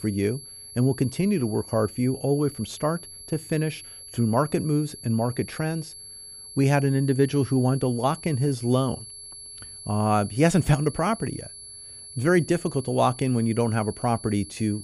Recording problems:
high-pitched whine; noticeable; throughout; 11 kHz, 15 dB below the speech

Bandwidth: 15.5 kHz